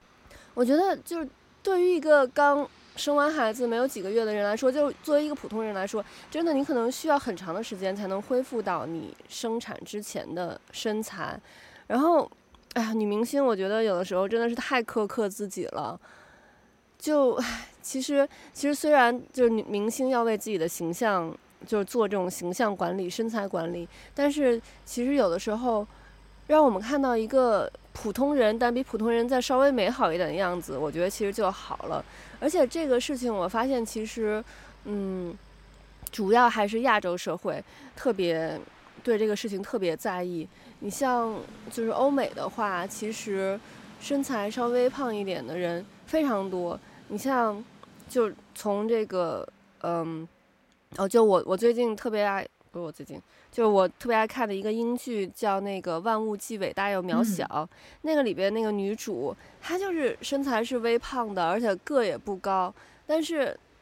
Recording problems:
train or aircraft noise; faint; throughout; 25 dB below the speech

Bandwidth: 16 kHz